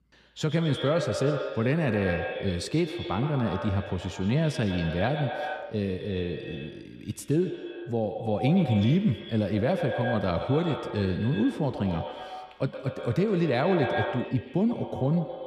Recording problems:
echo of what is said; strong; throughout; 120 ms later, 7 dB below the speech

